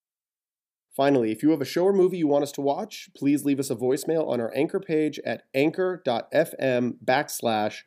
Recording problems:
none

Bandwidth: 14.5 kHz